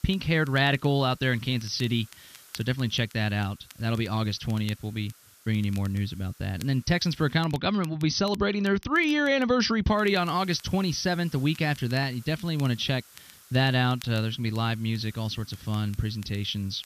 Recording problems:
high frequencies cut off; noticeable; nothing above 6 kHz
hiss; faint; until 7.5 s and from 10 s on; 25 dB below the speech
crackle, like an old record; faint; 25 dB below the speech

